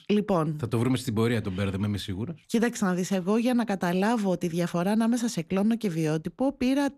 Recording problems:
none

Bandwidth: 14 kHz